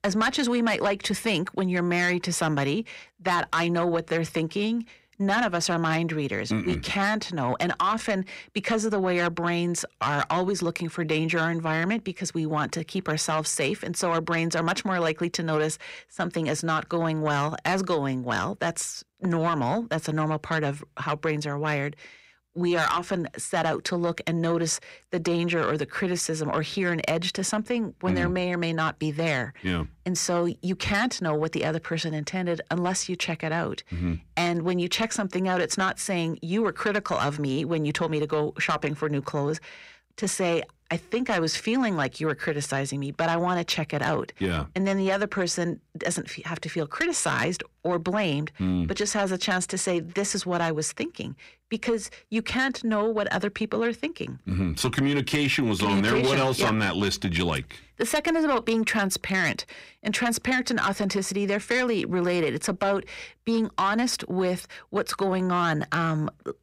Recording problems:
distortion; slight; 10 dB below the speech

